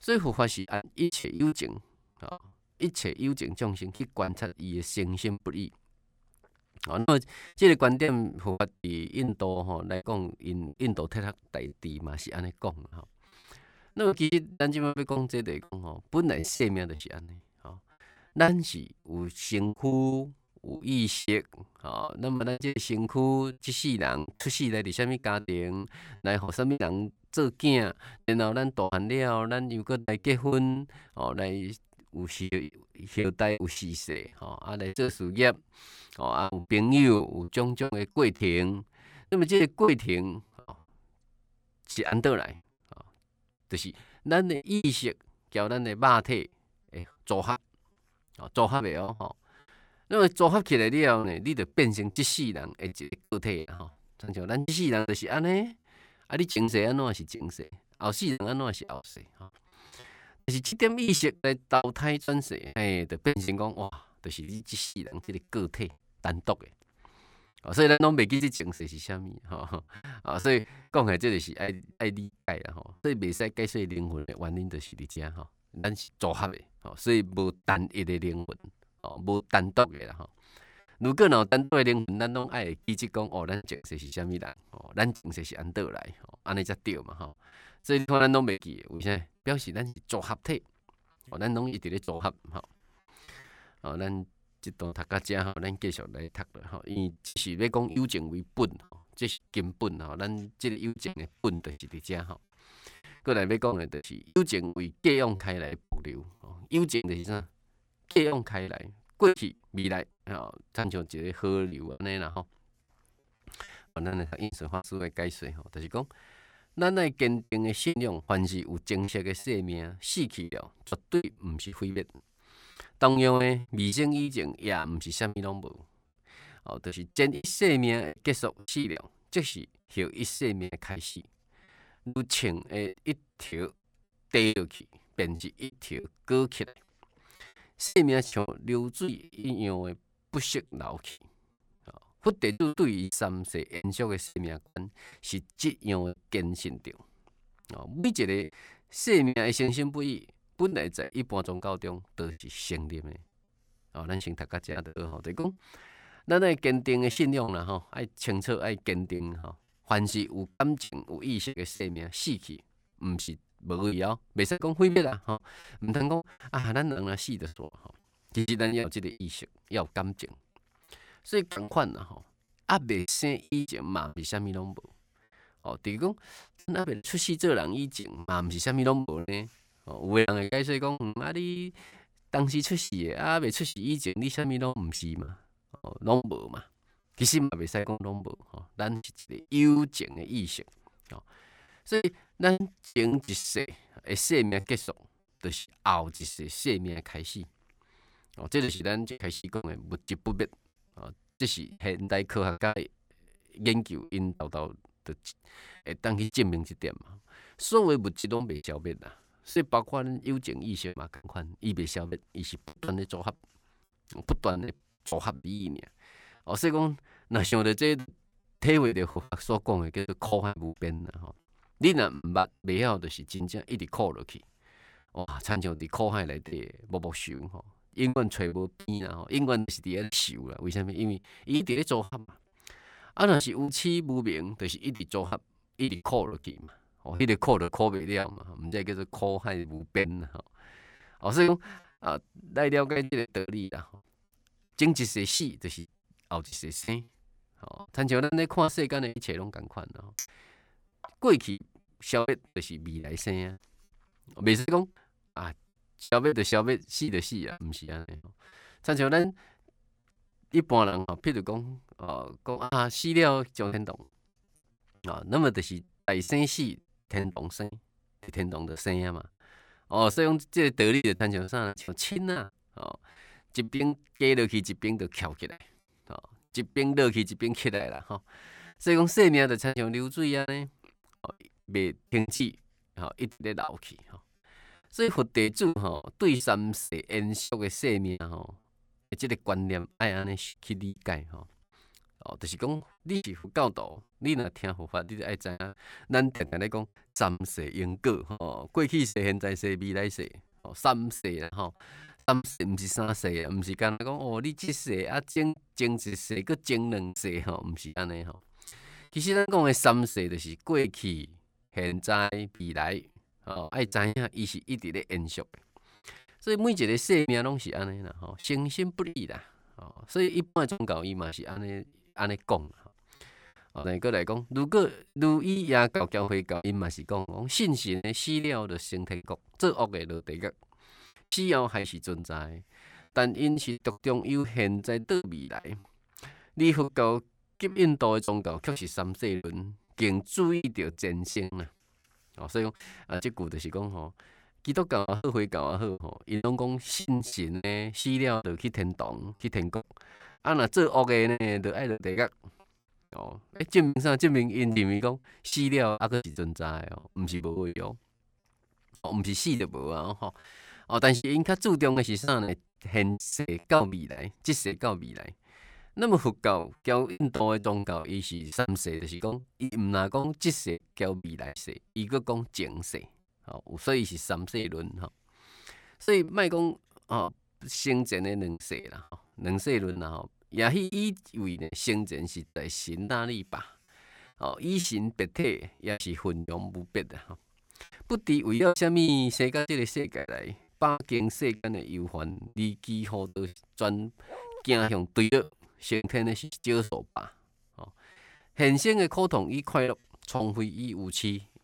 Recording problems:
choppy; very; 13% of the speech affected
clattering dishes; noticeable; at 4:10; peak 9 dB below the speech
dog barking; faint; at 6:34; peak 15 dB below the speech

